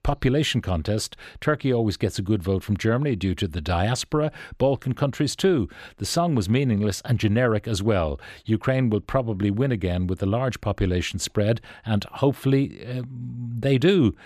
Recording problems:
none

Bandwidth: 14.5 kHz